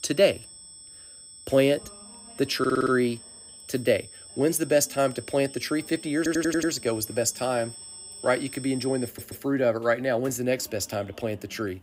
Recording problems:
high-pitched whine; noticeable; until 9.5 s; 8 kHz, 15 dB below the speech
voice in the background; faint; throughout; 30 dB below the speech
audio stuttering; at 2.5 s, at 6 s and at 9 s

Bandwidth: 15.5 kHz